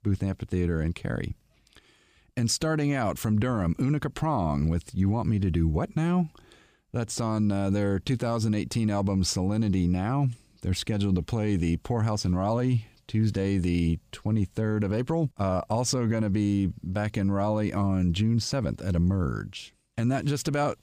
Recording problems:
none

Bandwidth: 15 kHz